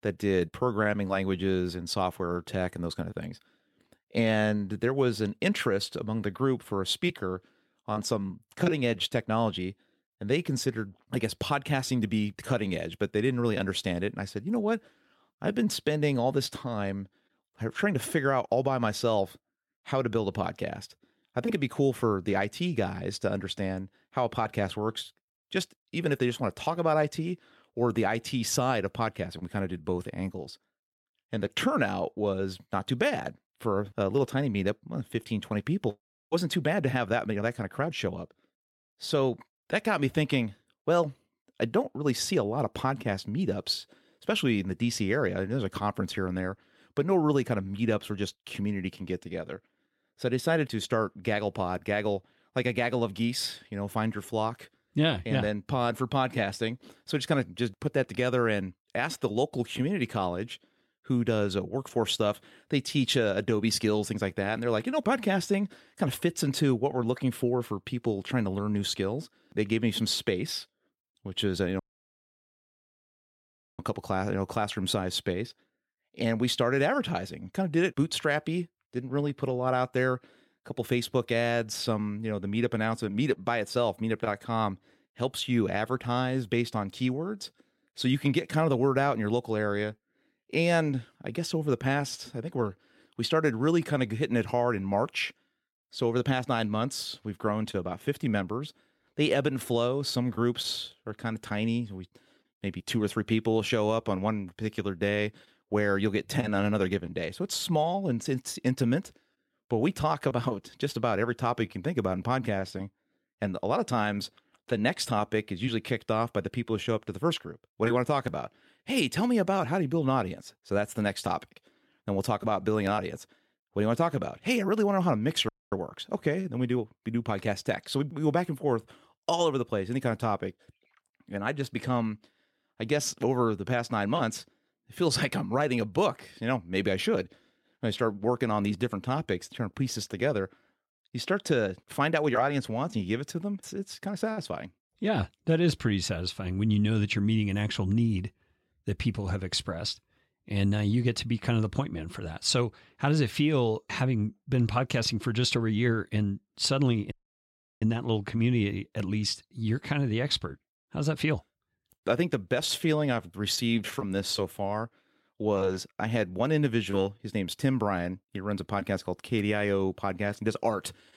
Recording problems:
audio cutting out; at 1:12 for 2 s, at 2:05 and at 2:37 for 0.5 s

